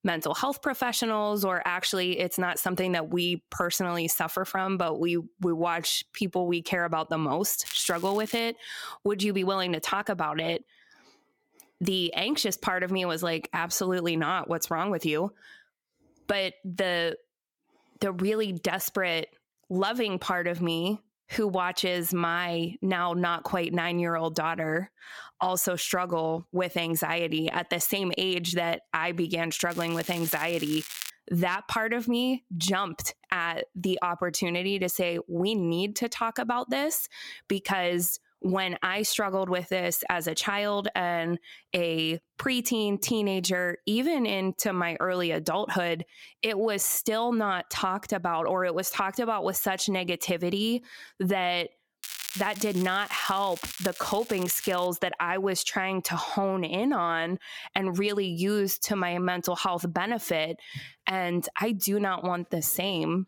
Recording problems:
squashed, flat; somewhat
crackling; noticeable; at 7.5 s, from 30 to 31 s and from 52 to 55 s; 10 dB below the speech

